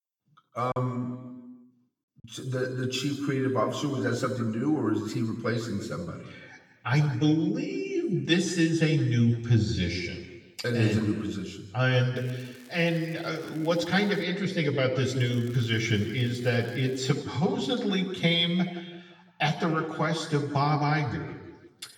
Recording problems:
off-mic speech; far
room echo; noticeable; dies away in 1.2 s
crackling; faint; from 12 to 14 s and from 15 to 17 s; 25 dB below the speech
choppy; very; from 0.5 to 2 s; 9% of the speech affected

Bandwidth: 18 kHz